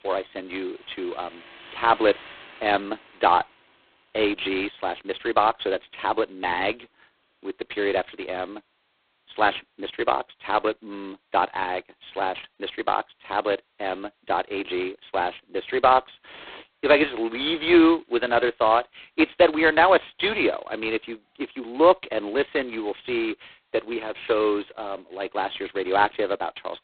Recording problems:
phone-call audio; poor line; nothing above 4 kHz
traffic noise; faint; throughout; 20 dB below the speech

